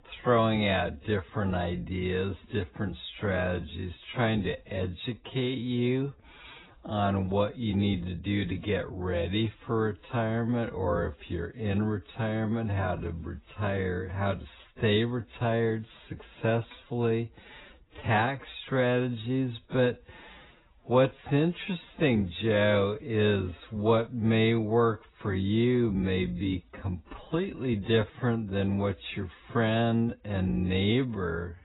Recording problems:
garbled, watery; badly; nothing above 4 kHz
wrong speed, natural pitch; too slow; 0.6 times normal speed

